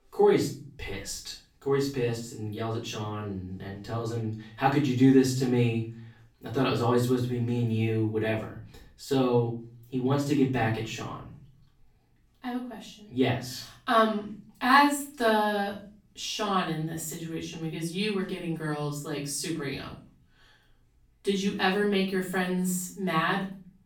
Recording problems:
off-mic speech; far
room echo; slight; dies away in 0.4 s

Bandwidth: 17.5 kHz